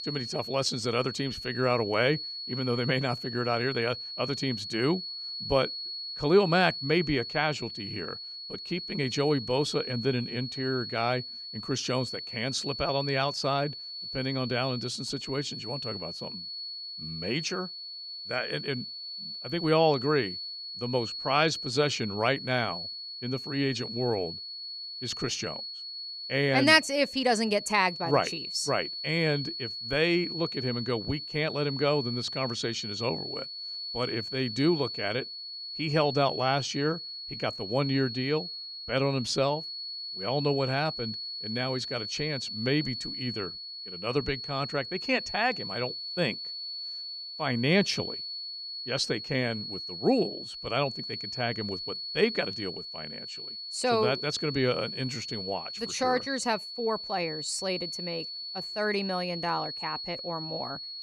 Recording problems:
high-pitched whine; loud; throughout; 4.5 kHz, 6 dB below the speech

